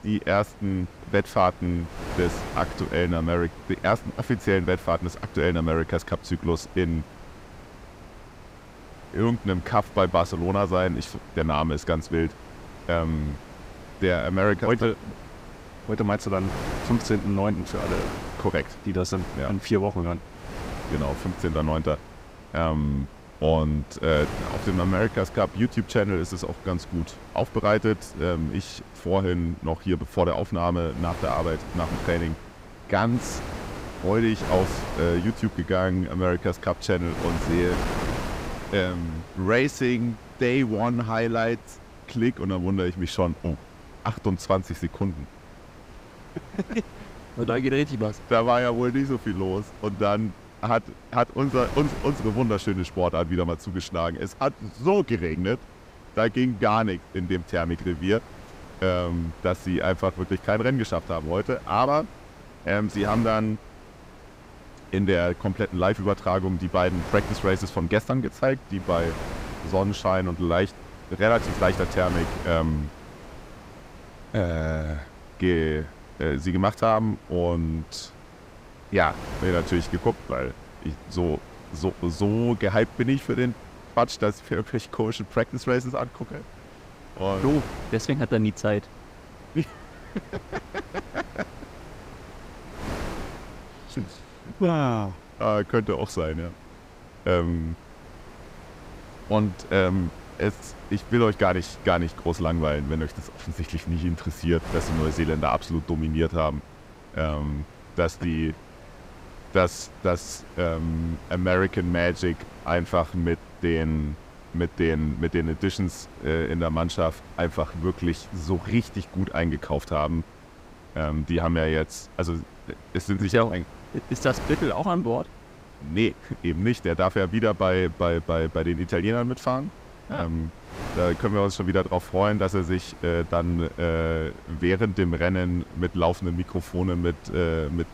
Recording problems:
wind noise on the microphone; occasional gusts; 15 dB below the speech

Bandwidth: 15.5 kHz